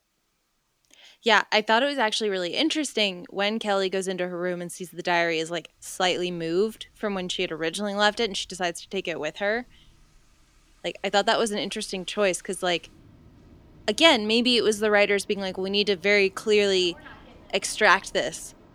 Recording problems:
rain or running water; faint; throughout; 30 dB below the speech

